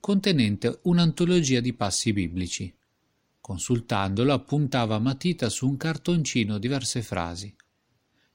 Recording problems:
none

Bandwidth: 16 kHz